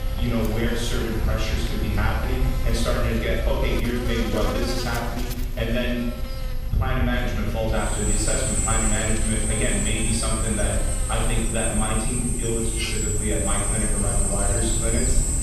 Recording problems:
off-mic speech; far
room echo; noticeable; dies away in 1.2 s
electrical hum; loud; throughout; 60 Hz, 9 dB below the speech
machinery noise; loud; throughout; 1 dB below the speech
high-pitched whine; faint; throughout; 11.5 kHz, 25 dB below the speech
low rumble; faint; throughout; 20 dB below the speech

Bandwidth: 15 kHz